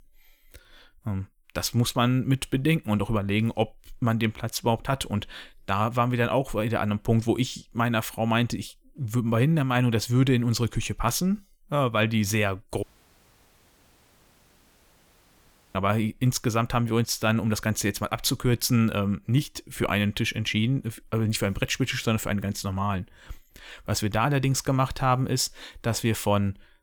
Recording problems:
audio cutting out; at 13 s for 3 s

